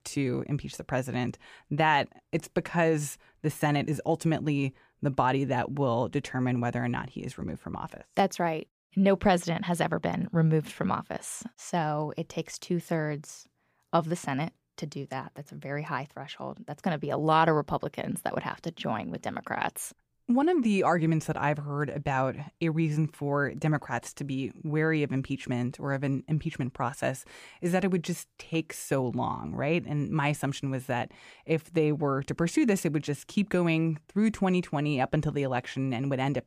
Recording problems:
none

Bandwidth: 15 kHz